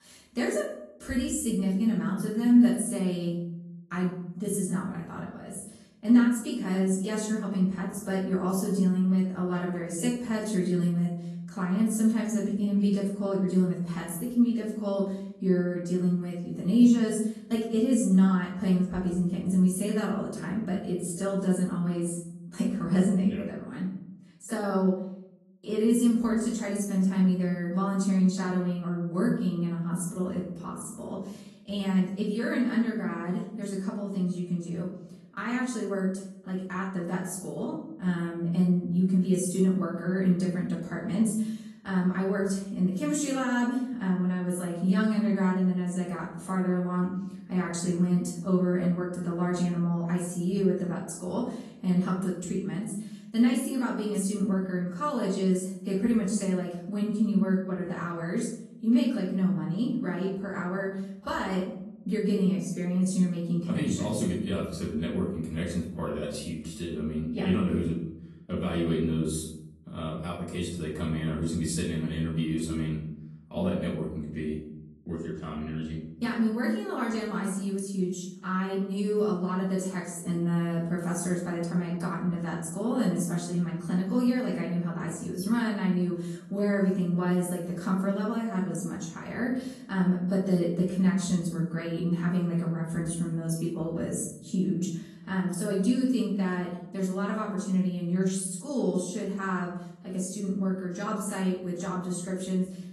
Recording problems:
off-mic speech; far
room echo; noticeable; dies away in 0.6 s
garbled, watery; slightly; nothing above 11.5 kHz

